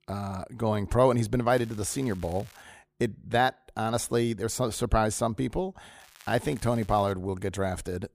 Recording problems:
crackling; faint; from 1.5 to 2.5 s and from 6 to 7 s; 25 dB below the speech

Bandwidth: 15 kHz